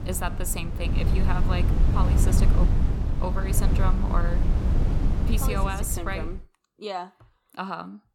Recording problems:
wind noise on the microphone; heavy; until 6.5 s; 4 dB below the speech

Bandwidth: 17.5 kHz